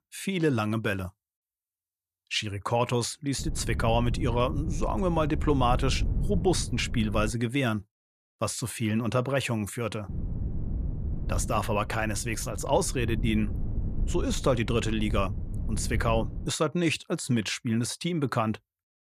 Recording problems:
wind noise on the microphone; occasional gusts; from 3.5 to 7.5 s and from 10 to 16 s; 15 dB below the speech

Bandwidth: 14.5 kHz